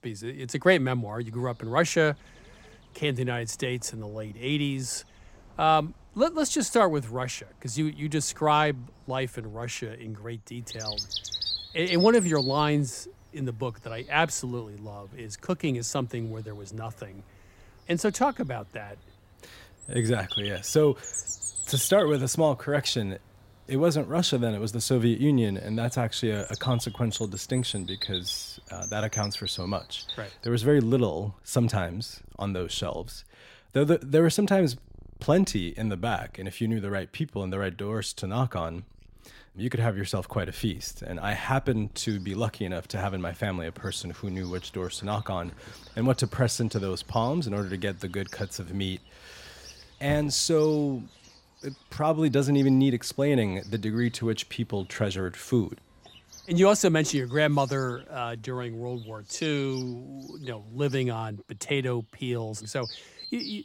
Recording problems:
animal sounds; noticeable; throughout; 10 dB below the speech

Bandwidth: 16 kHz